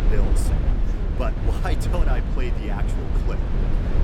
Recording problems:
low rumble; loud; throughout; 2 dB below the speech
voice in the background; noticeable; throughout; 10 dB below the speech

